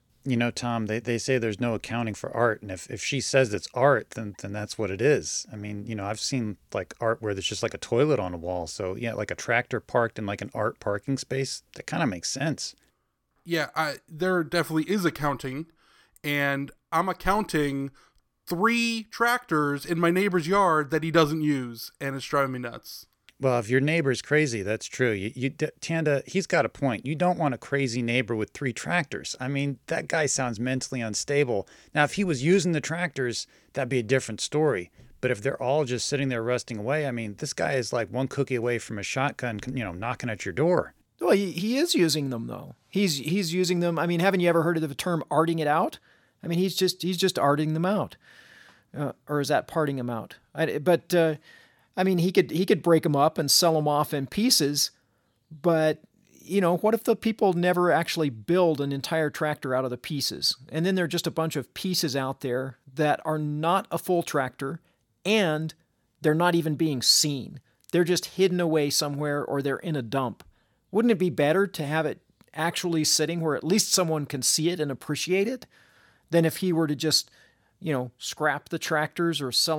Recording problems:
abrupt cut into speech; at the end

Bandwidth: 17 kHz